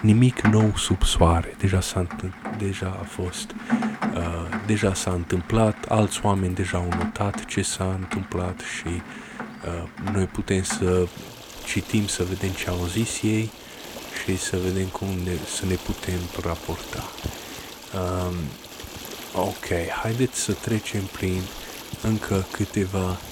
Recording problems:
rain or running water; loud; throughout; 10 dB below the speech

